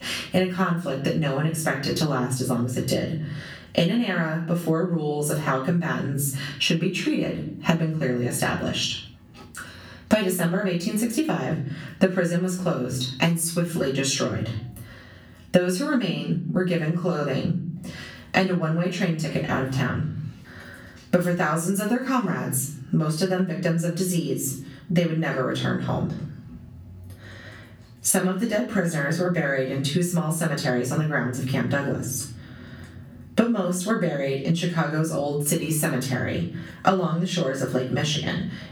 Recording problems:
off-mic speech; far
room echo; slight; dies away in 0.5 s
squashed, flat; somewhat

